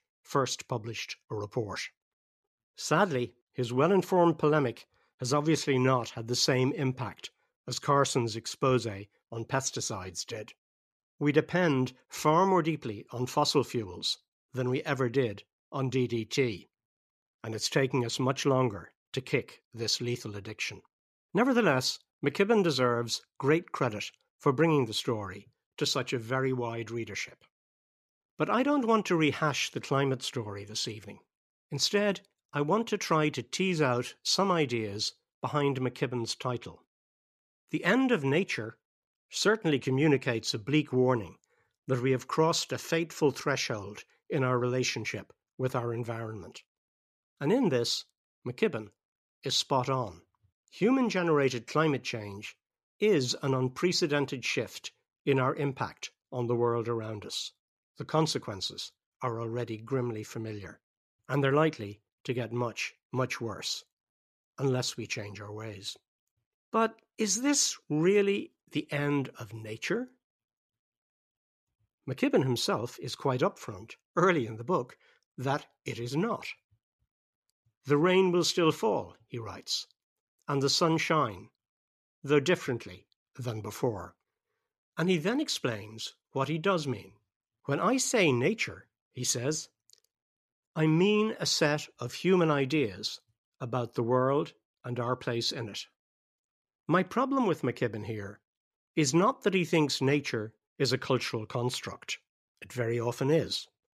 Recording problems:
none

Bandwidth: 14.5 kHz